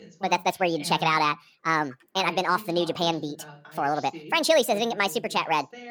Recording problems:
wrong speed and pitch; too fast and too high; 1.5 times normal speed
voice in the background; noticeable; throughout; 20 dB below the speech

